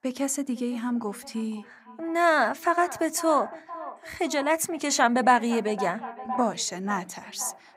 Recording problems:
echo of what is said; noticeable; throughout; 510 ms later, 15 dB below the speech

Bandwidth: 15.5 kHz